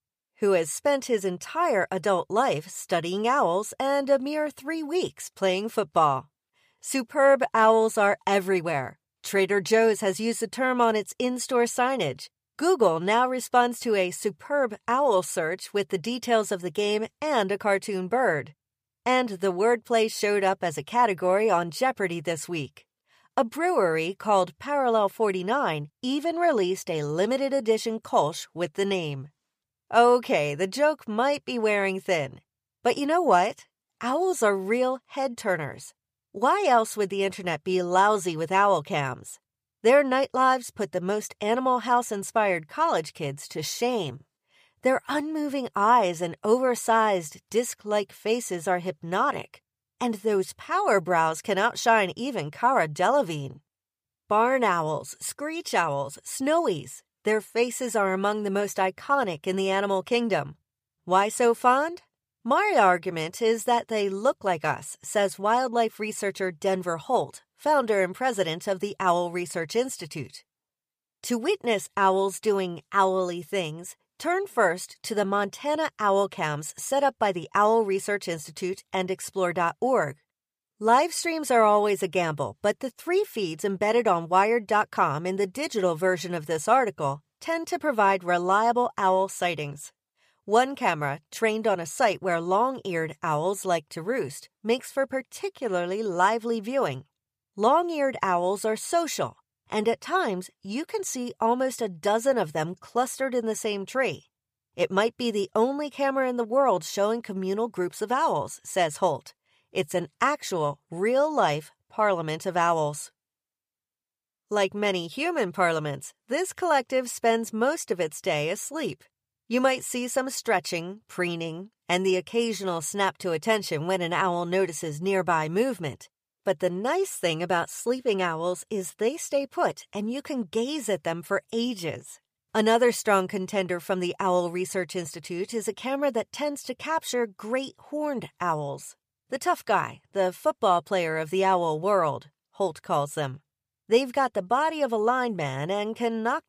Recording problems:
none

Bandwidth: 15 kHz